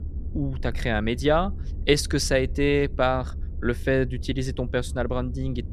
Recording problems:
low rumble; faint; throughout; 25 dB below the speech

